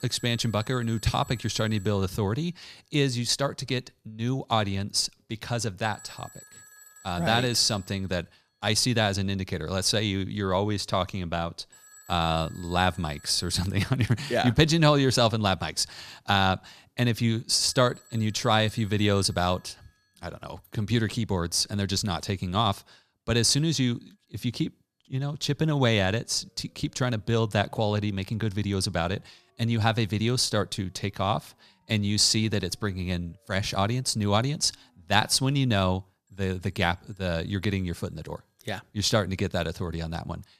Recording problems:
alarms or sirens; faint; throughout; 25 dB below the speech

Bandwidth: 14.5 kHz